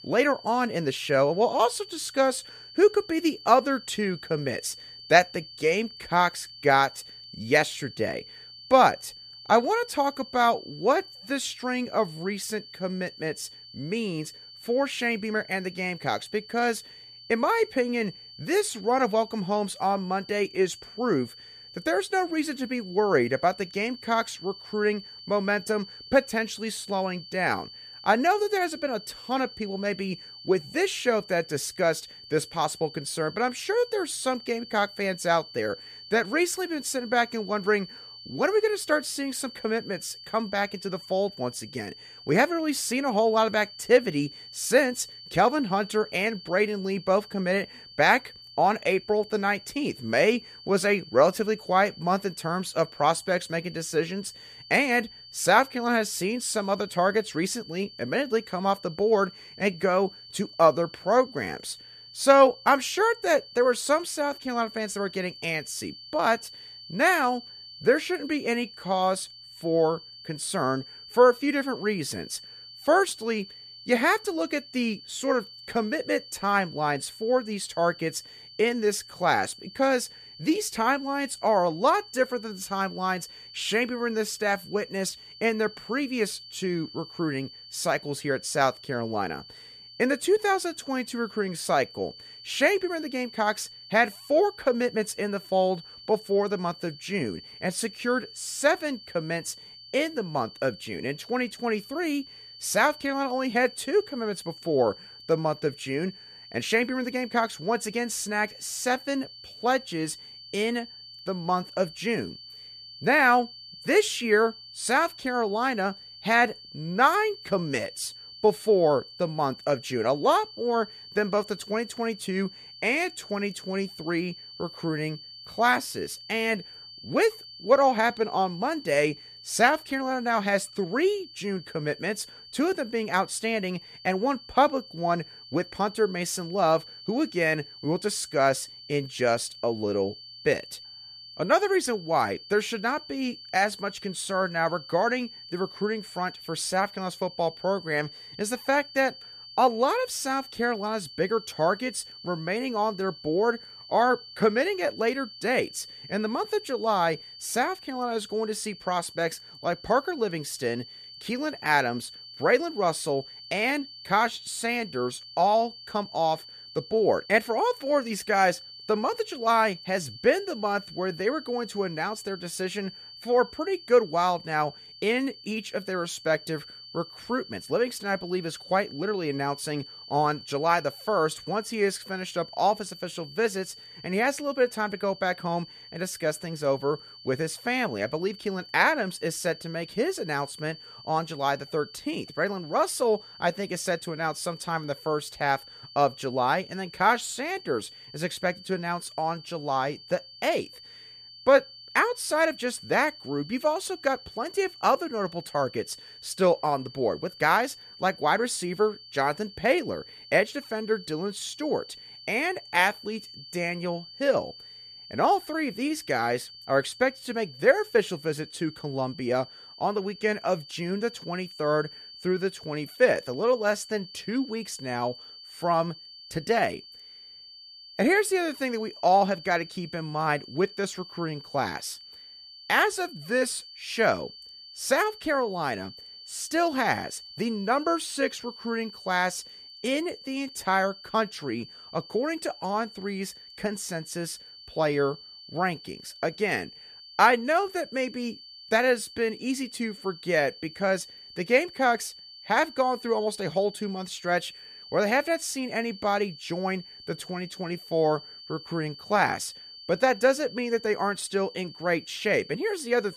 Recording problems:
high-pitched whine; noticeable; throughout; 4.5 kHz, 15 dB below the speech

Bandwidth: 14.5 kHz